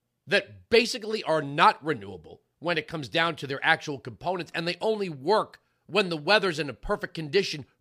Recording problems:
none

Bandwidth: 15 kHz